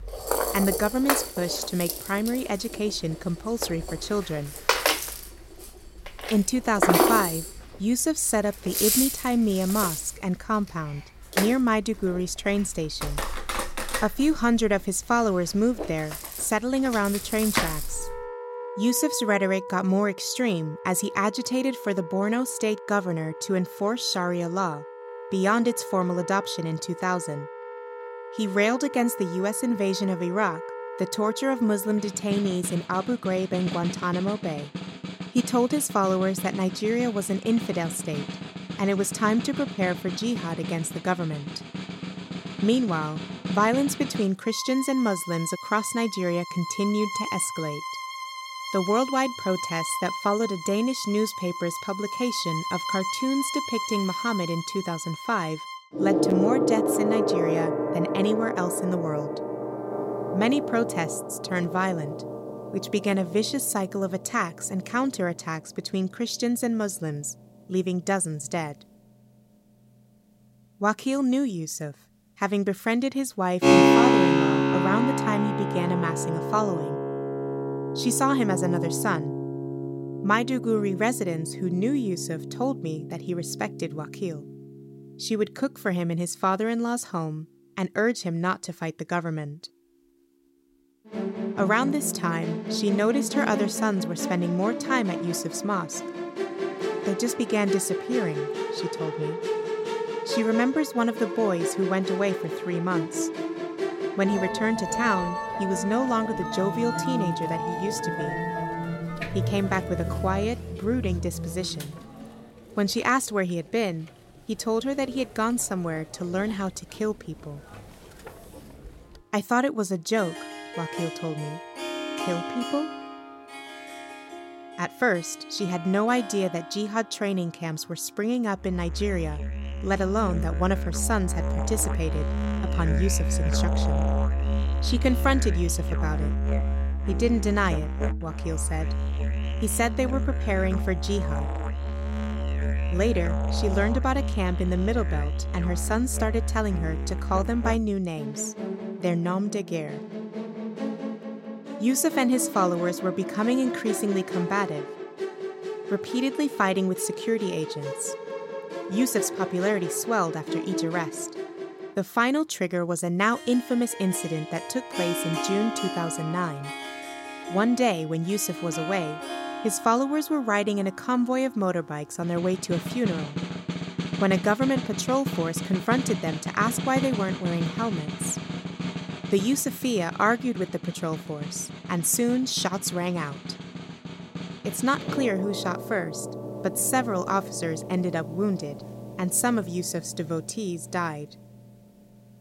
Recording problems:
background music; loud; throughout; 4 dB below the speech

